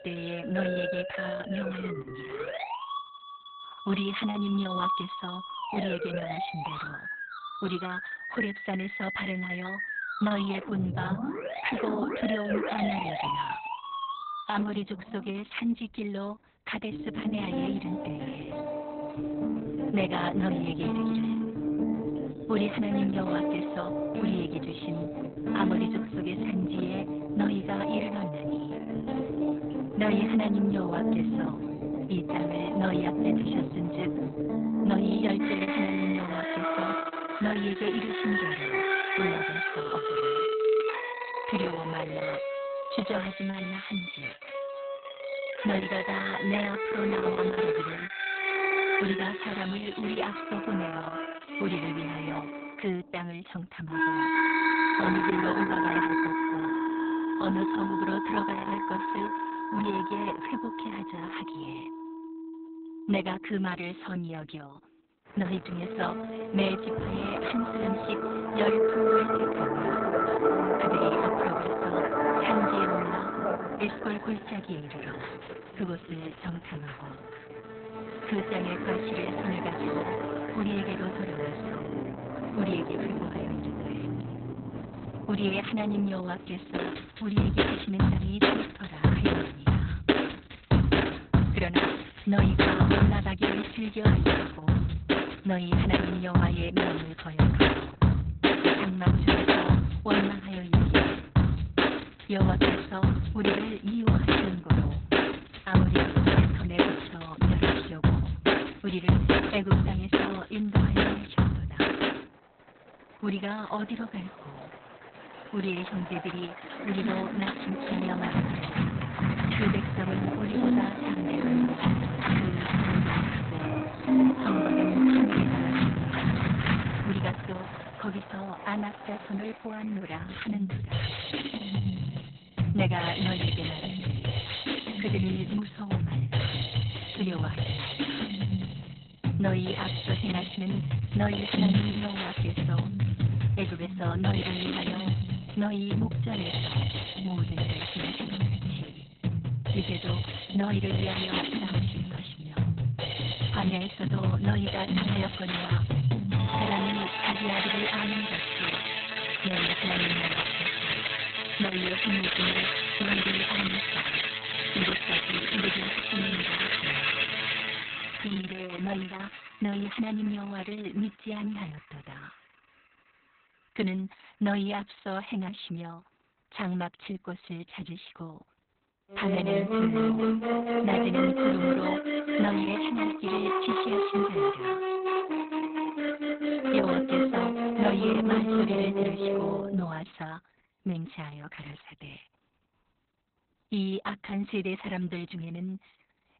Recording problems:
garbled, watery; badly; nothing above 4 kHz
background music; very loud; throughout; 5 dB above the speech

